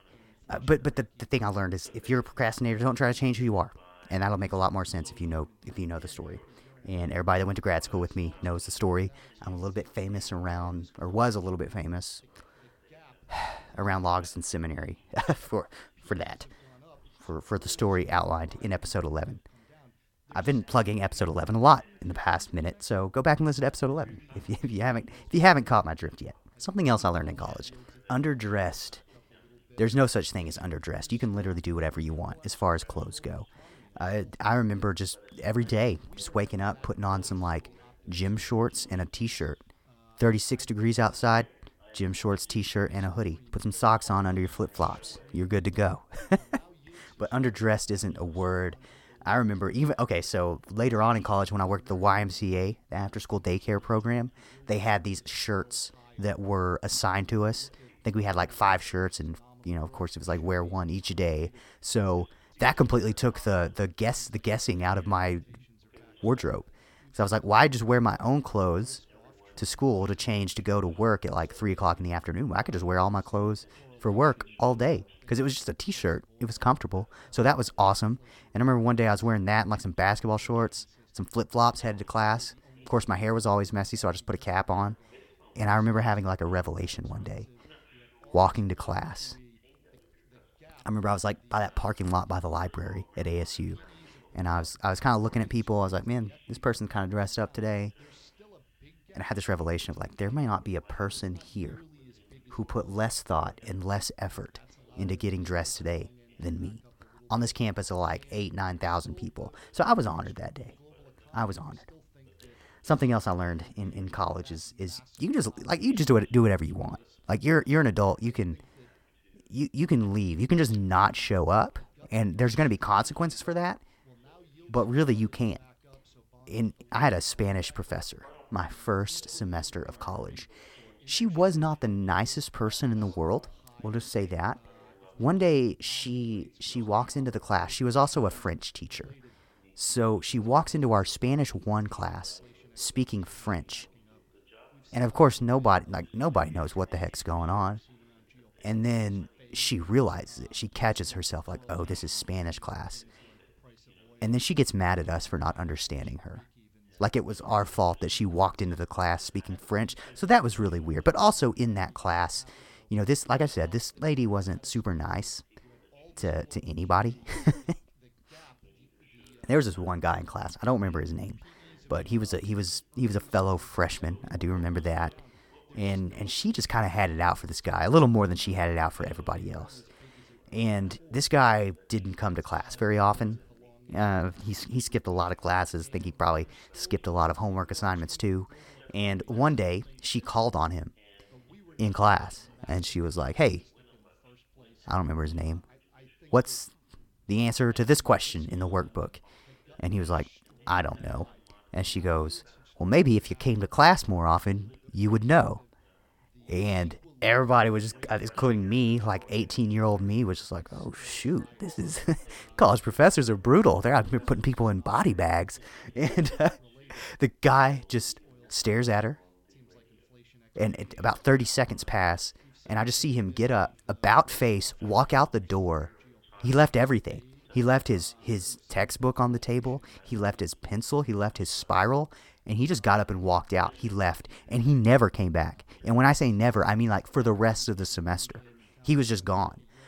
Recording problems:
background chatter; faint; throughout; 2 voices, 30 dB below the speech

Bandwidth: 17 kHz